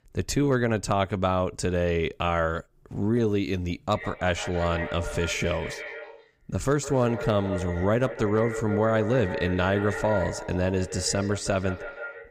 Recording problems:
echo of what is said; strong; from 4 s on; 160 ms later, 9 dB below the speech

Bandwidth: 15.5 kHz